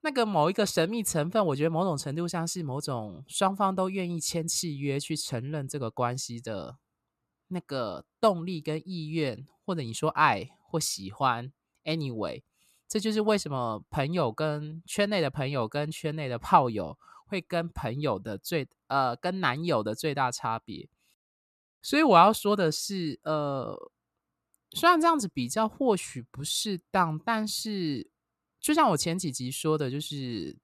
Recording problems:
none

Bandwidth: 14.5 kHz